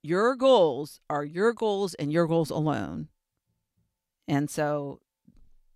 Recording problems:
none

